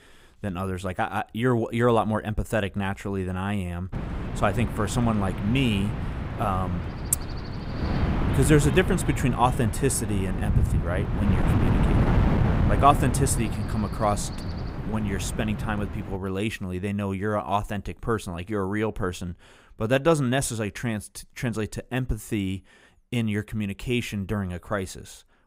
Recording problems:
wind noise on the microphone; heavy; from 4 to 16 s; 7 dB below the speech

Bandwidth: 15.5 kHz